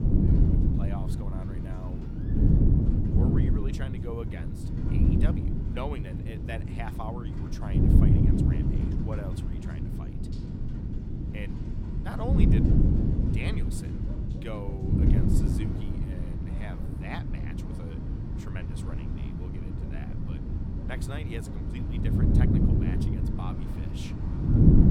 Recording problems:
wind noise on the microphone; heavy; 5 dB above the speech
animal sounds; noticeable; throughout; 20 dB below the speech
rain or running water; noticeable; throughout; 10 dB below the speech

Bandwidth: 17 kHz